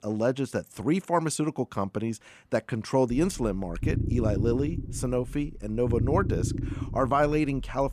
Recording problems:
low rumble; noticeable; from 3 s on; 10 dB below the speech

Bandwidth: 14.5 kHz